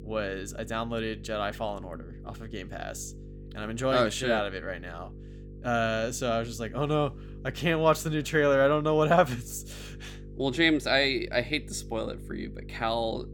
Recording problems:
electrical hum; faint; throughout; 50 Hz, 25 dB below the speech

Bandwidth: 18.5 kHz